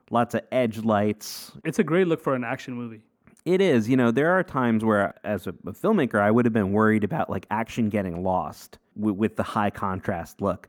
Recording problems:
muffled; slightly; fading above 2.5 kHz

